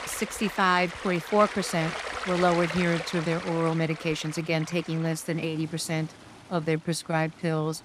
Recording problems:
rain or running water; loud; throughout; 9 dB below the speech

